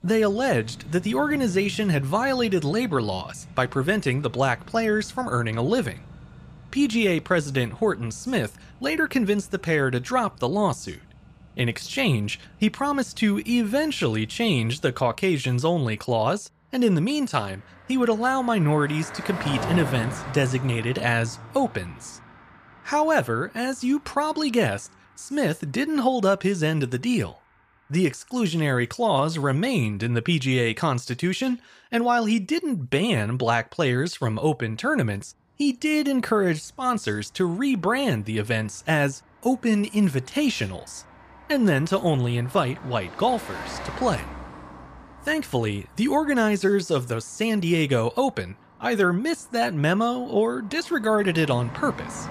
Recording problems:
traffic noise; noticeable; throughout; 15 dB below the speech

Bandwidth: 14.5 kHz